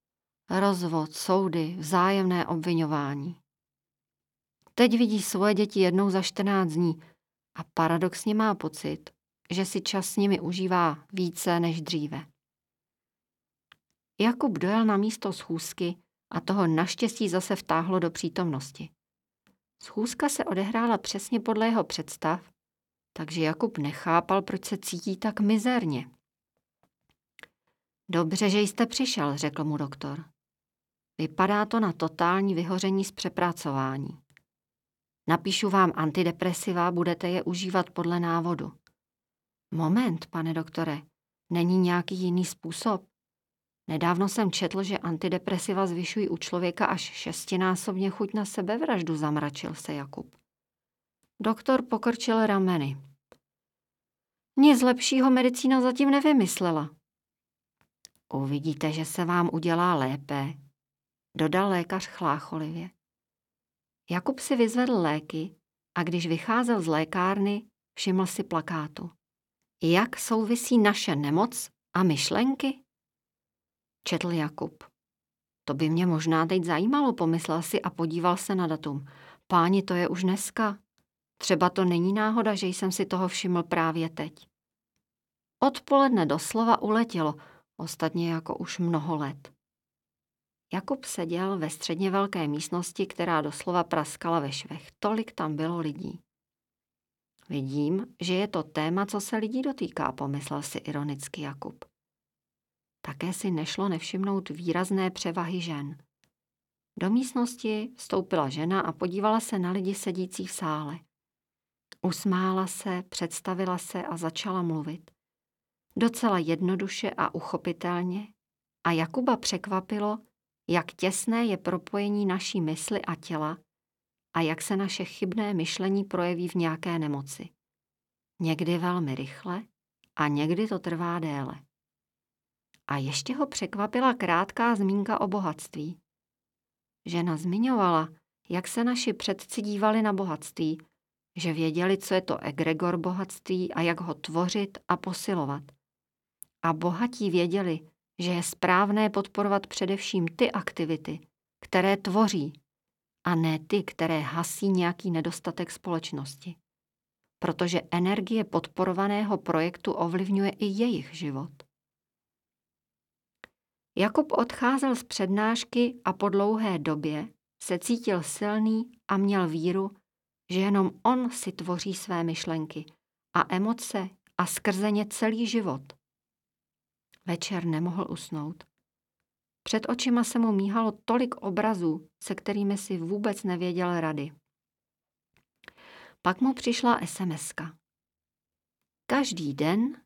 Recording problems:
none

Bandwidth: 17.5 kHz